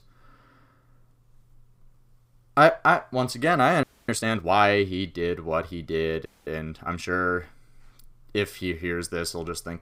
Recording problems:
audio freezing; at 4 s and at 6.5 s

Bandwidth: 15.5 kHz